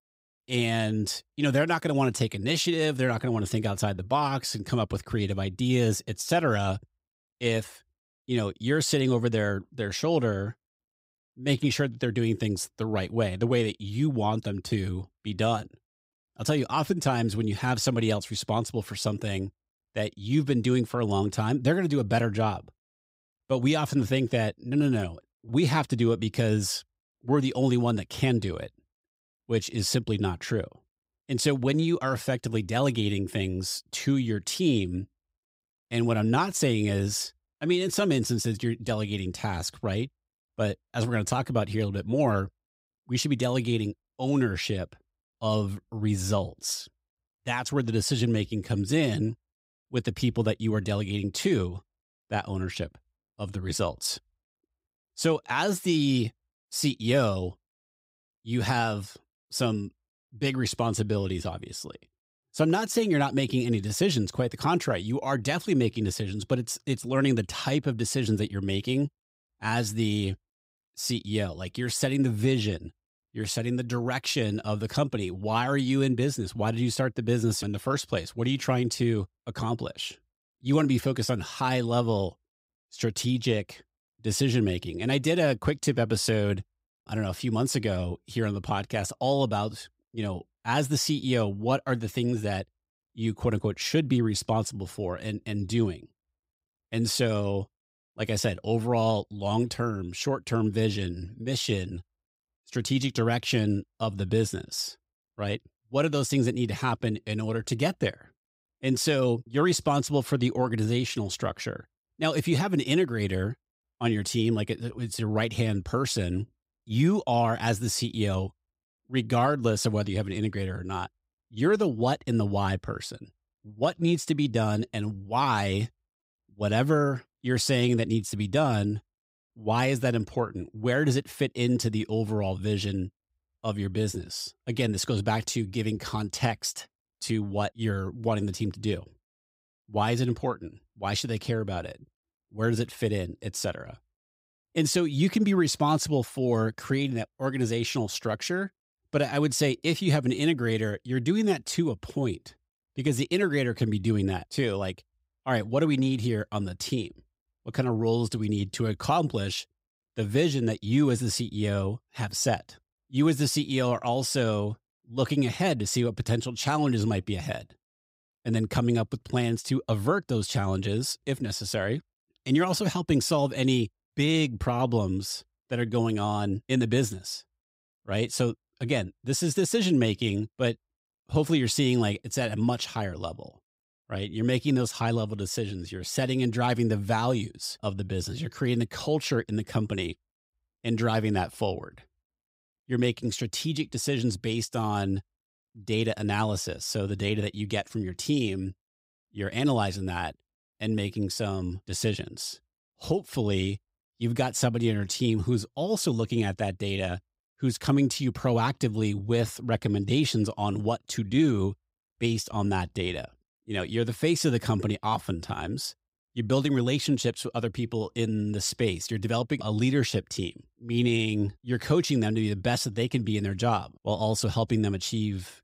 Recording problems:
none

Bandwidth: 15.5 kHz